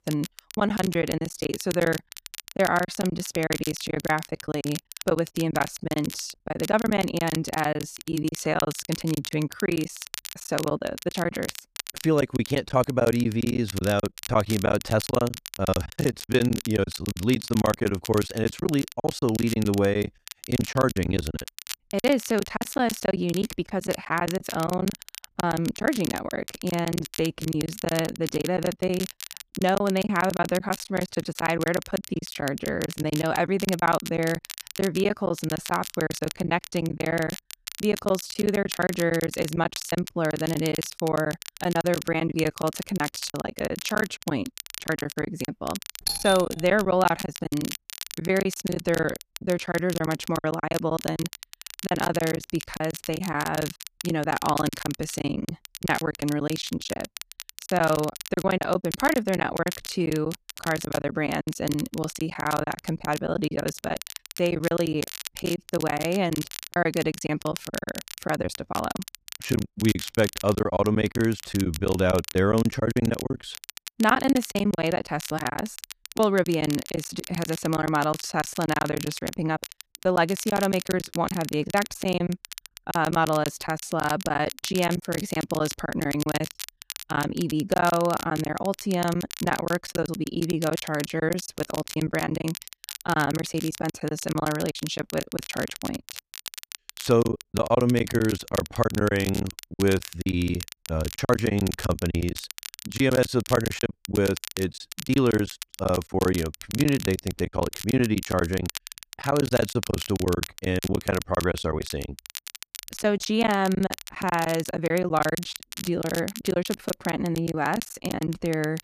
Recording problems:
crackle, like an old record; noticeable; 10 dB below the speech
choppy; very; 17% of the speech affected
doorbell; loud; at 46 s; peak level with the speech

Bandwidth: 14.5 kHz